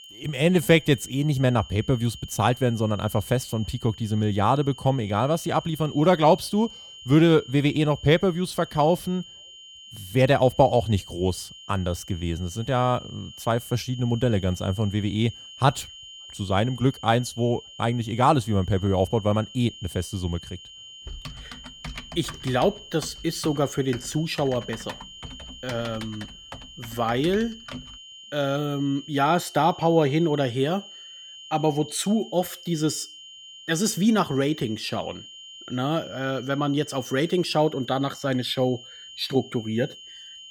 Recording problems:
high-pitched whine; noticeable; throughout; 3 kHz, 15 dB below the speech
keyboard typing; faint; from 21 to 28 s; peak 15 dB below the speech

